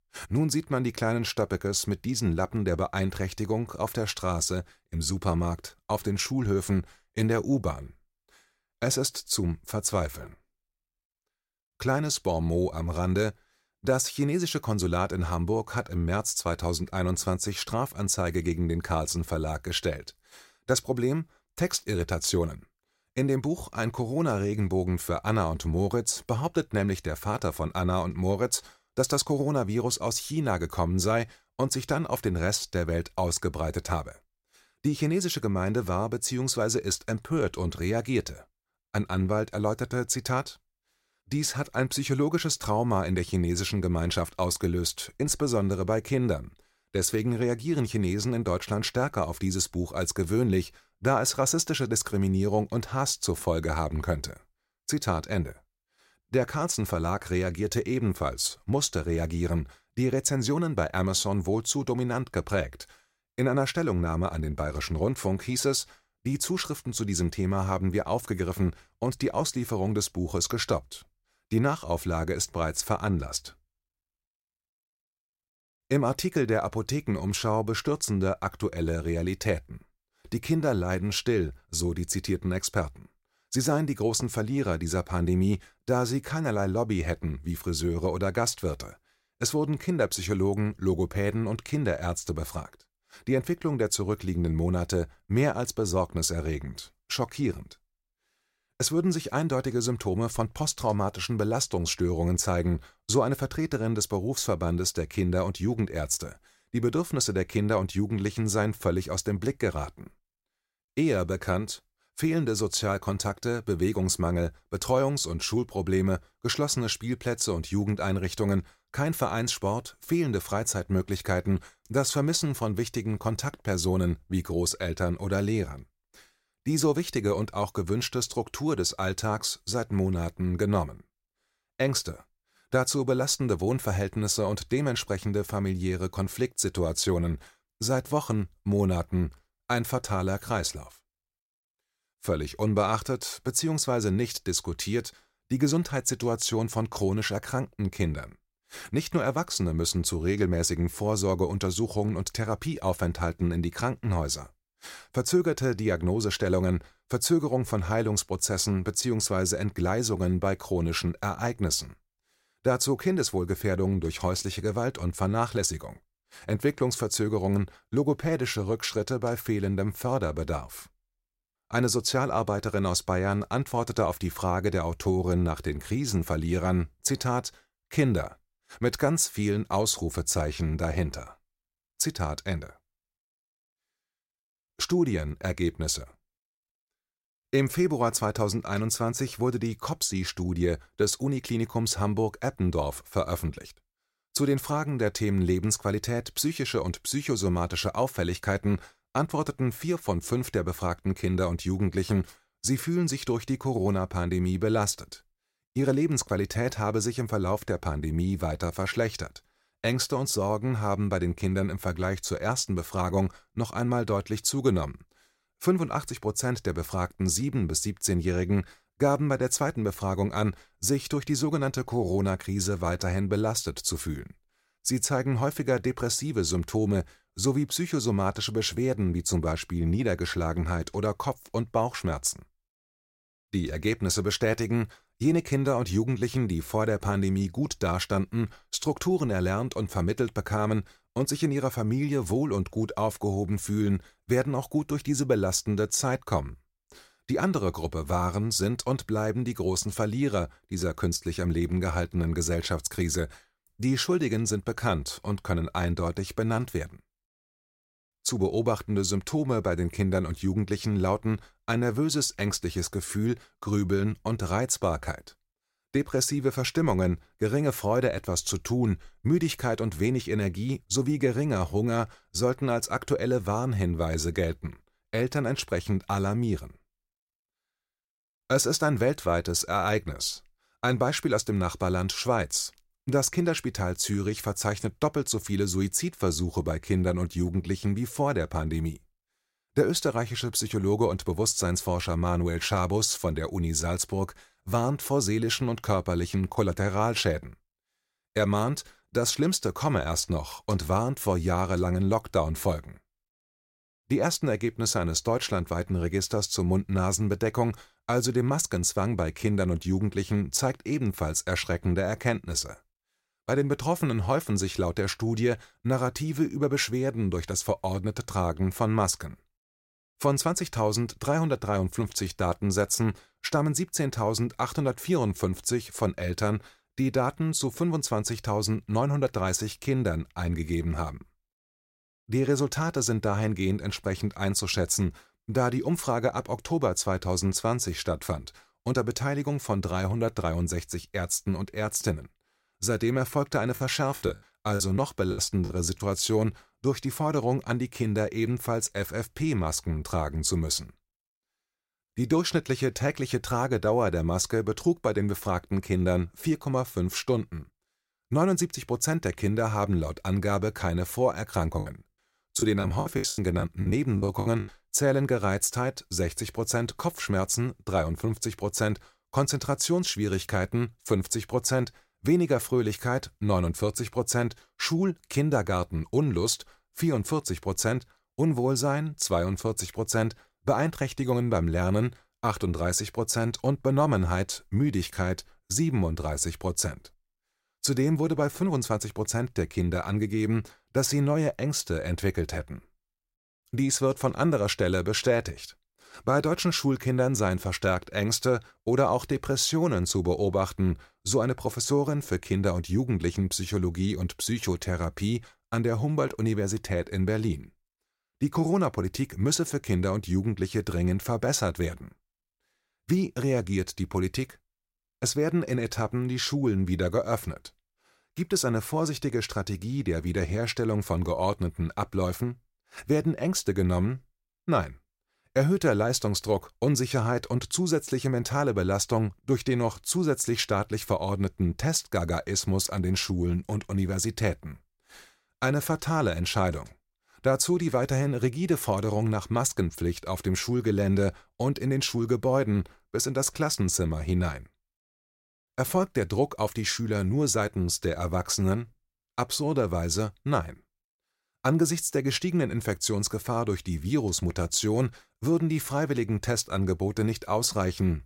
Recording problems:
choppy; very; from 5:44 to 5:46 and from 6:02 to 6:05; 16% of the speech affected

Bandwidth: 16 kHz